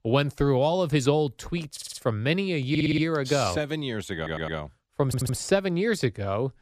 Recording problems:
audio stuttering; 4 times, first at 1.5 s

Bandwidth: 14.5 kHz